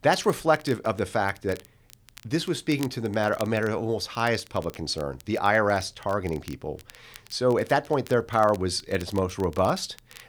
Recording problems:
crackle, like an old record; faint; 25 dB below the speech

